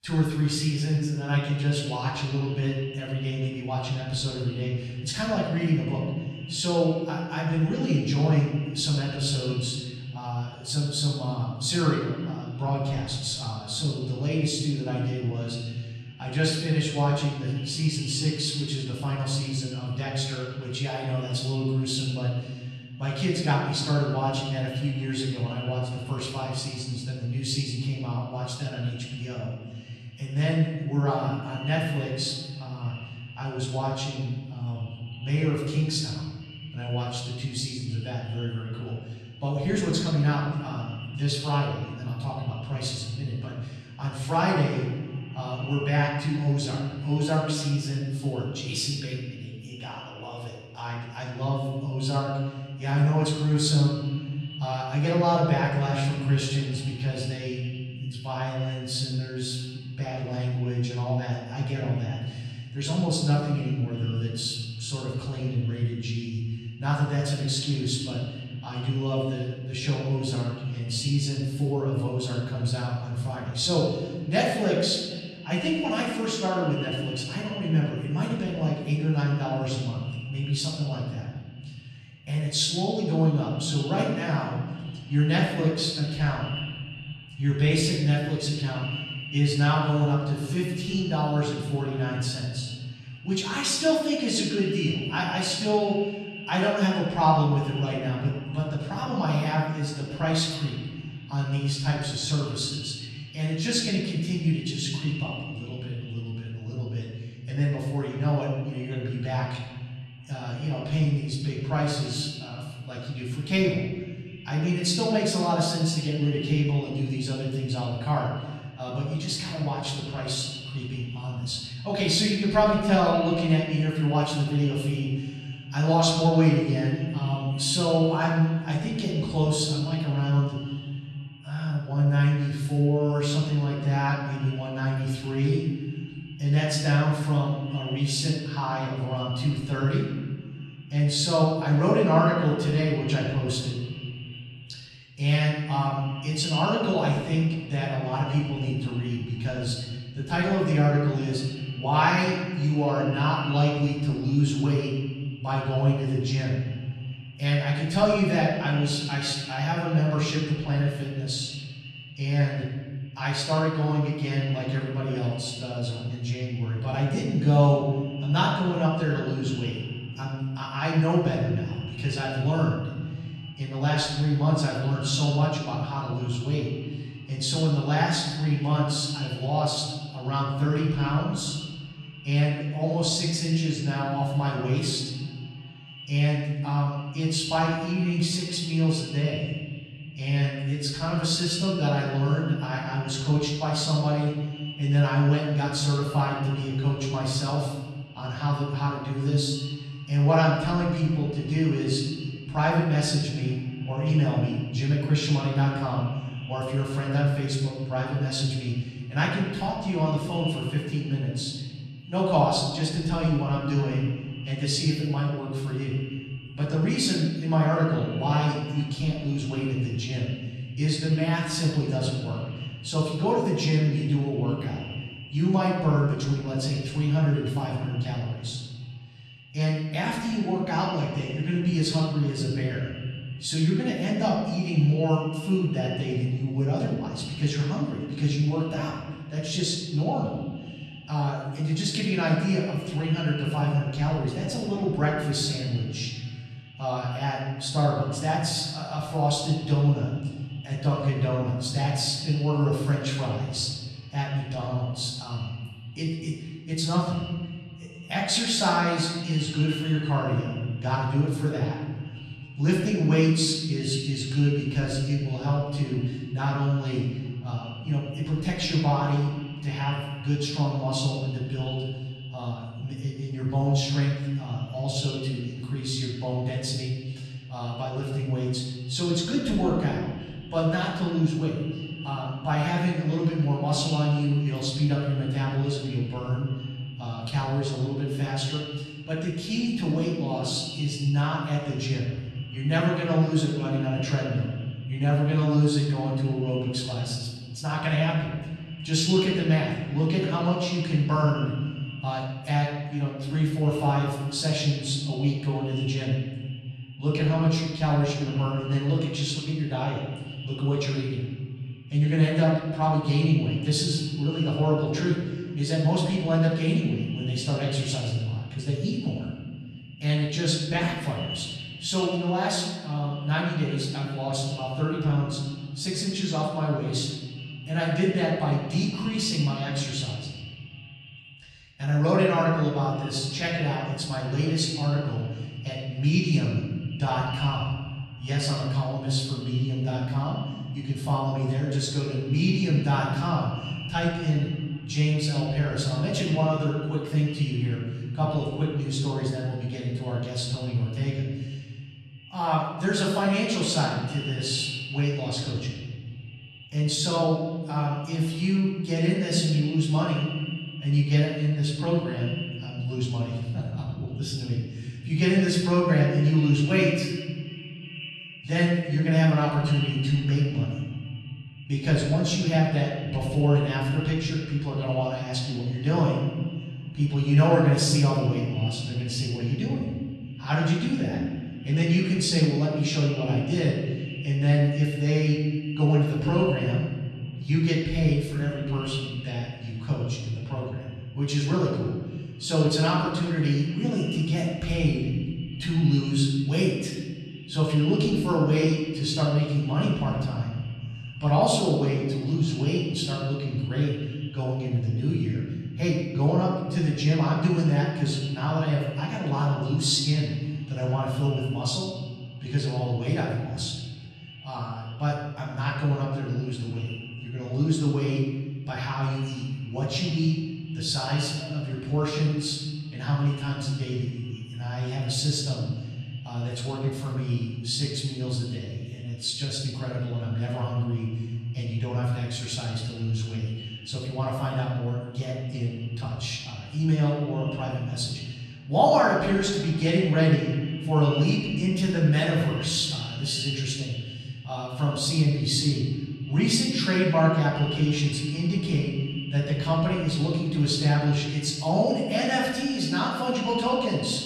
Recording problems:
off-mic speech; far
echo of what is said; noticeable; throughout; 360 ms later, 20 dB below the speech
room echo; noticeable; dies away in 1.6 s

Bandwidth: 14 kHz